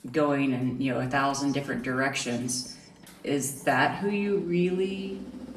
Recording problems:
off-mic speech; far
room echo; slight; dies away in 0.7 s
machinery noise; noticeable; throughout; 20 dB below the speech

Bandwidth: 14 kHz